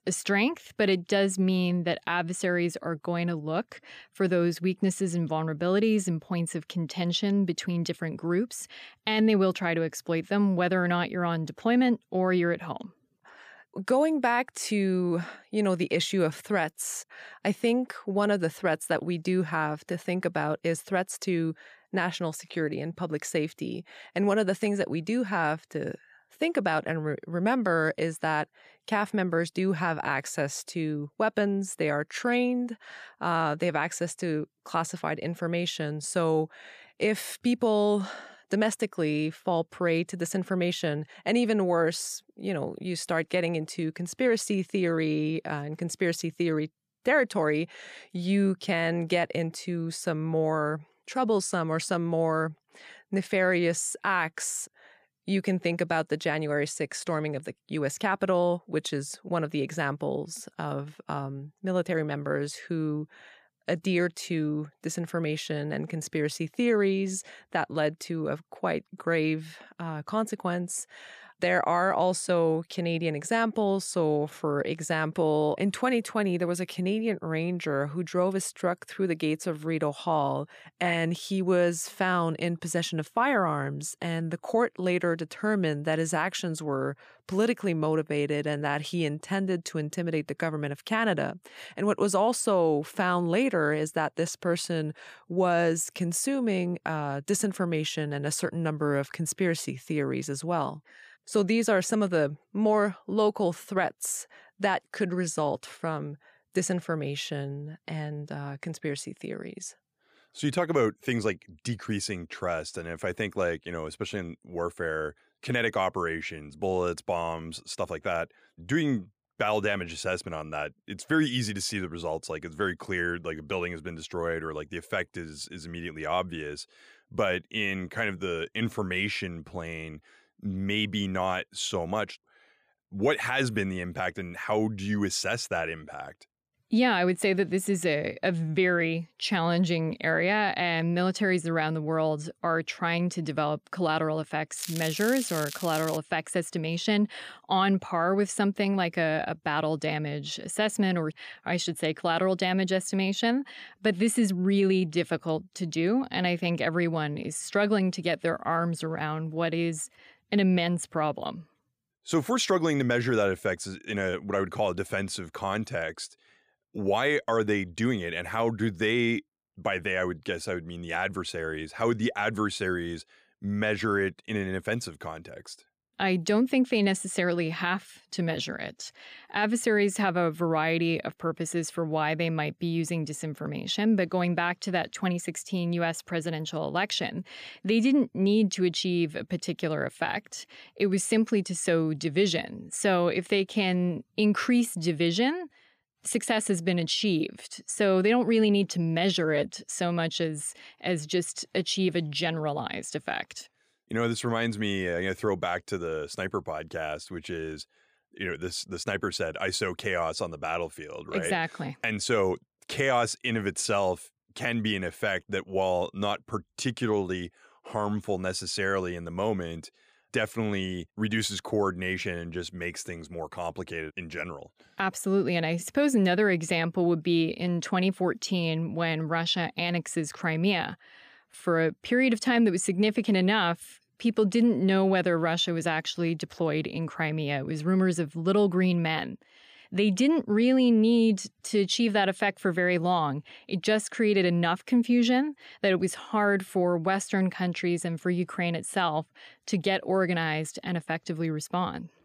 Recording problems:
crackling; loud; from 2:25 to 2:26; 9 dB below the speech

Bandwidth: 15 kHz